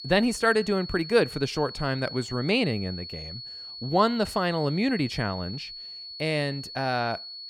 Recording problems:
high-pitched whine; noticeable; throughout; 4.5 kHz, 10 dB below the speech

